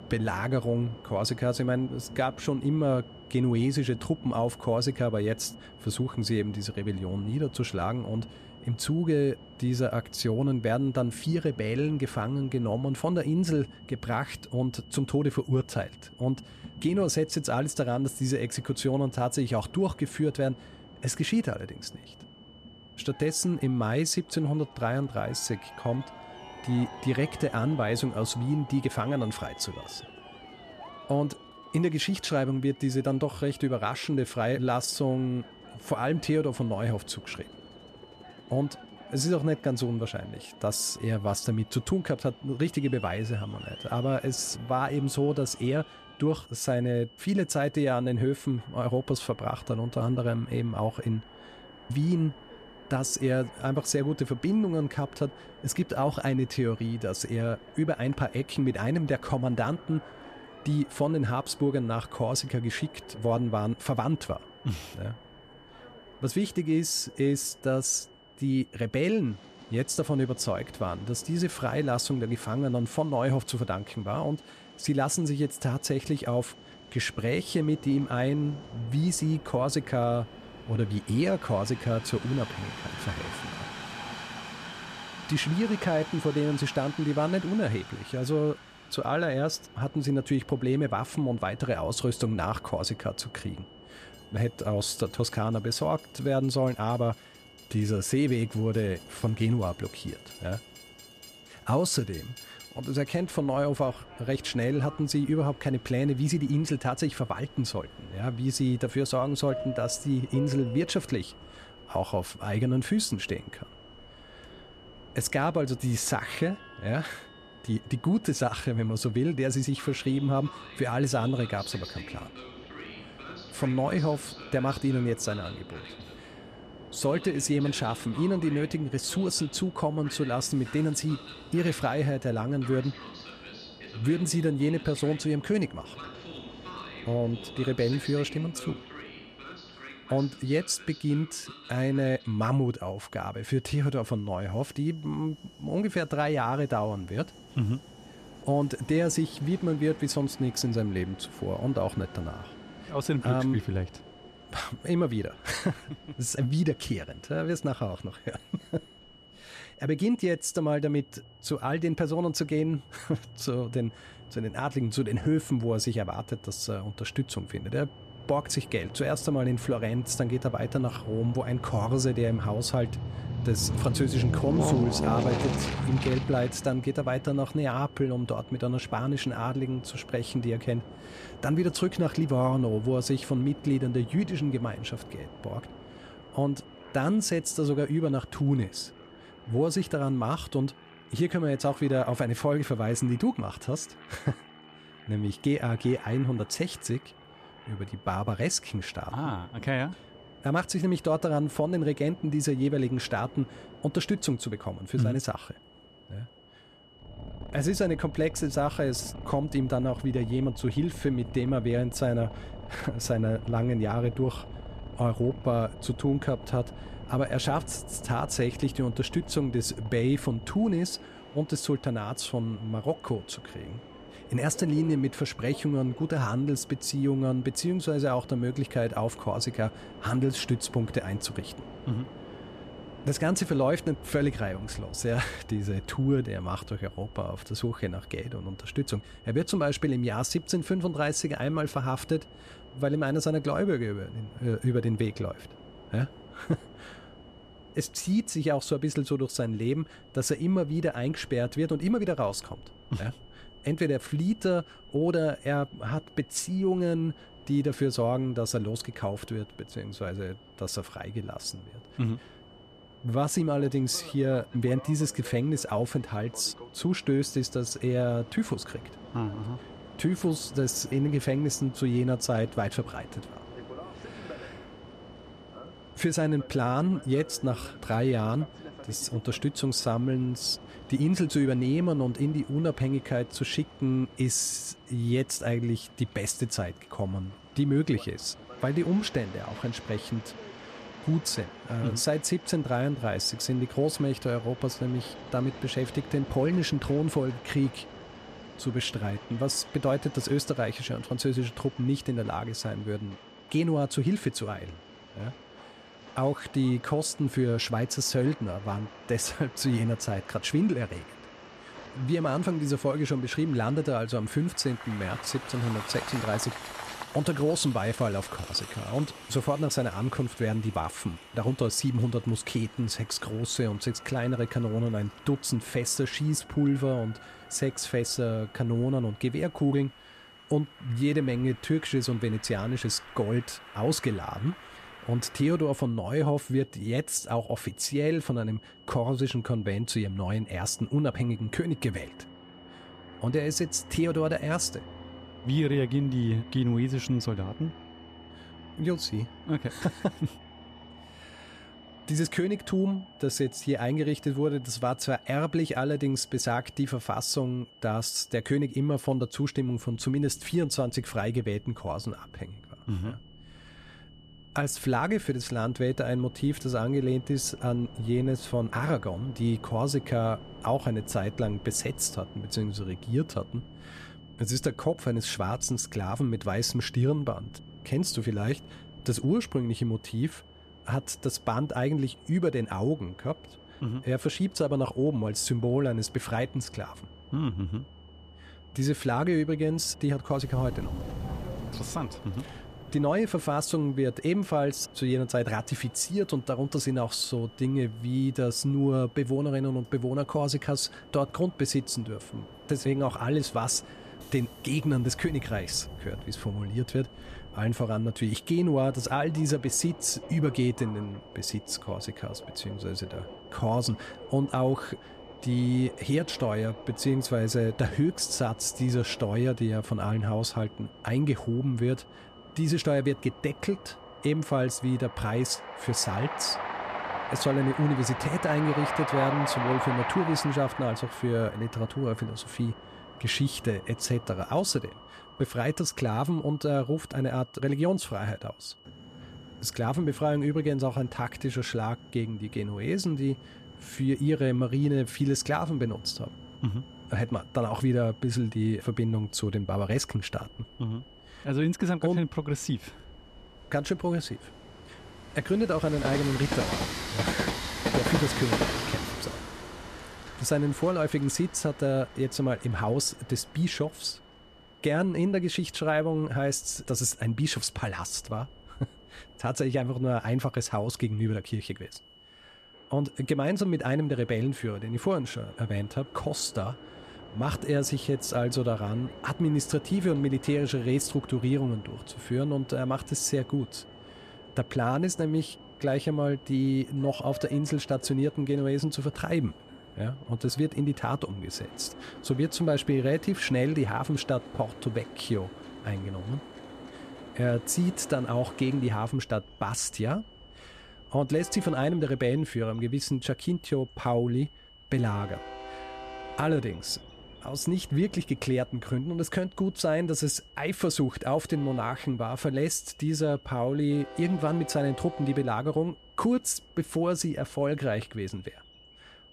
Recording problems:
train or aircraft noise; noticeable; throughout; 15 dB below the speech
high-pitched whine; faint; throughout; 3 kHz, 25 dB below the speech

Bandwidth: 14.5 kHz